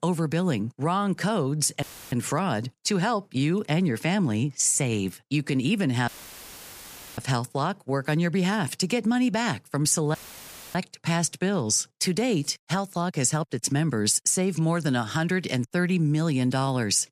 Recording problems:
audio cutting out; filled with static; at 2 s, at 6 s for 1 s and at 10 s for 0.5 s

